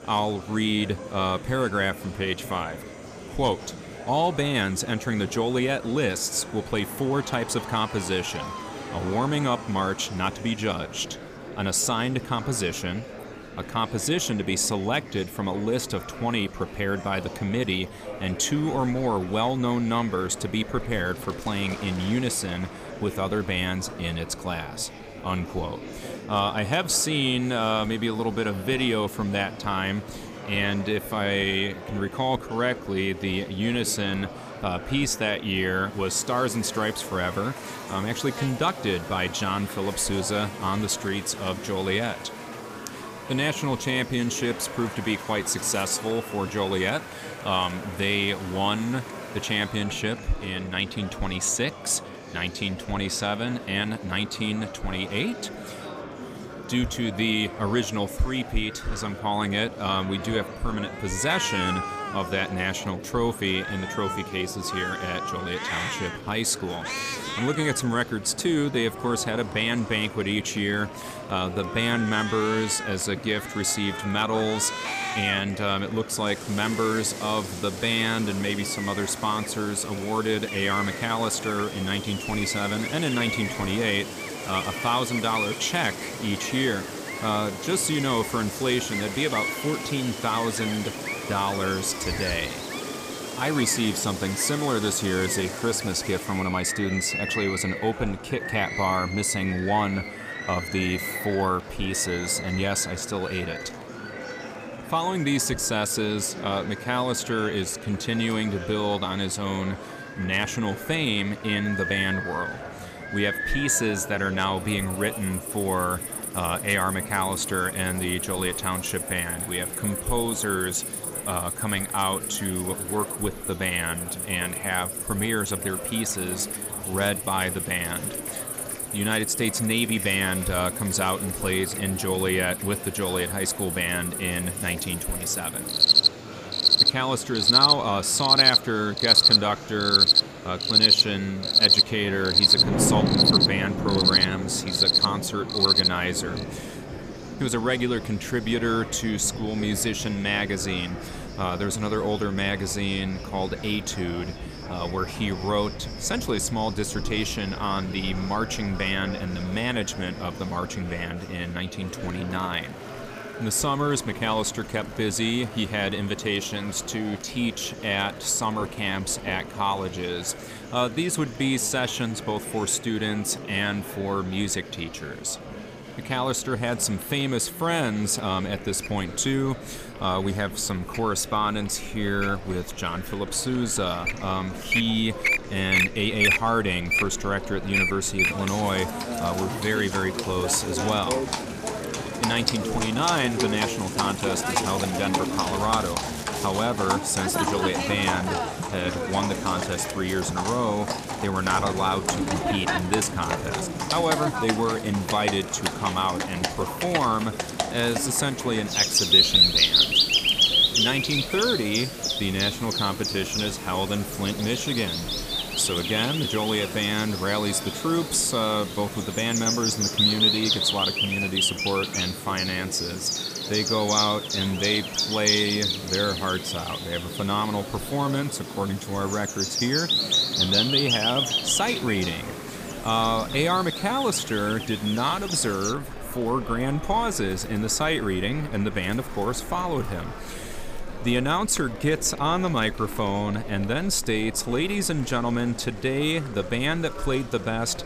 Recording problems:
animal sounds; very loud; throughout; 1 dB above the speech
rain or running water; noticeable; throughout; 15 dB below the speech
murmuring crowd; noticeable; throughout; 10 dB below the speech

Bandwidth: 15 kHz